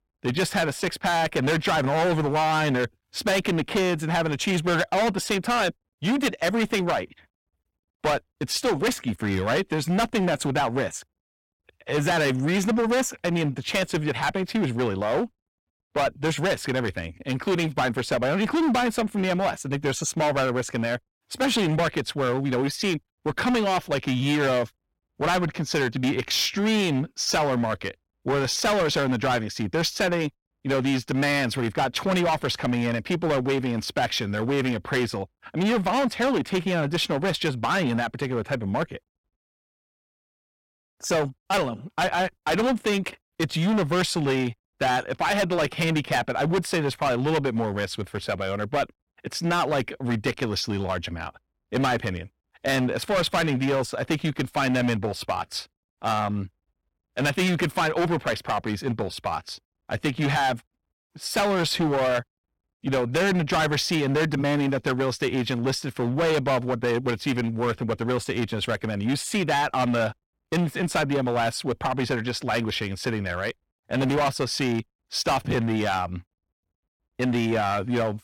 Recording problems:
distortion; heavy; 16% of the sound clipped

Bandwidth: 16.5 kHz